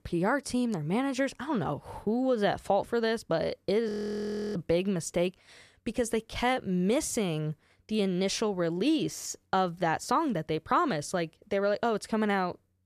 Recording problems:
audio freezing; at 4 s for 0.5 s

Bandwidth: 14.5 kHz